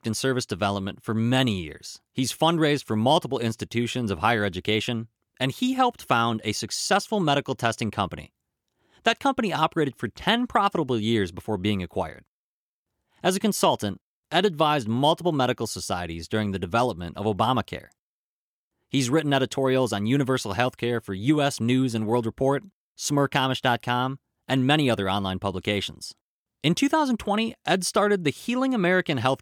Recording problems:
none

